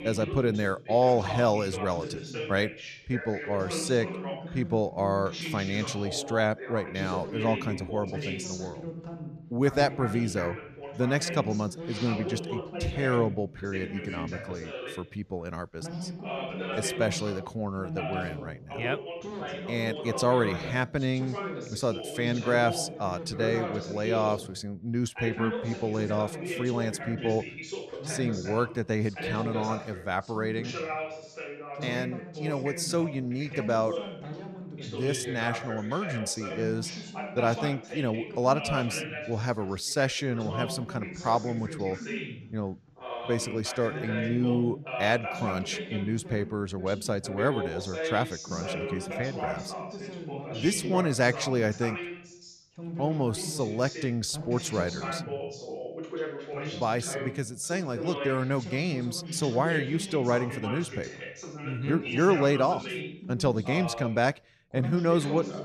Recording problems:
background chatter; loud; throughout; 2 voices, 7 dB below the speech

